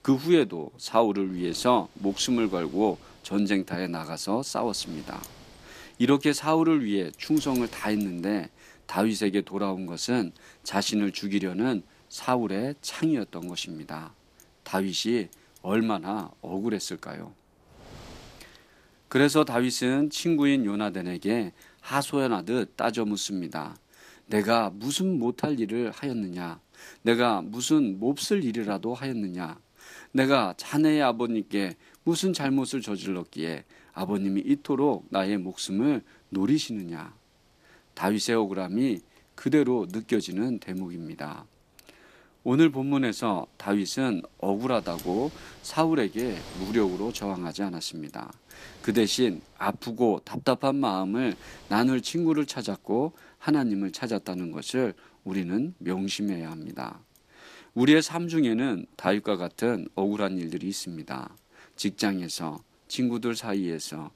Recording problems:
wind noise on the microphone; occasional gusts; 25 dB below the speech

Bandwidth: 14.5 kHz